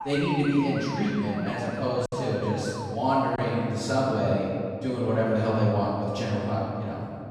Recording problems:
room echo; strong; dies away in 2.6 s
off-mic speech; far
siren; noticeable; until 3 s; peak 8 dB below the speech
choppy; occasionally; at 3.5 s; 1% of the speech affected

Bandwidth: 14.5 kHz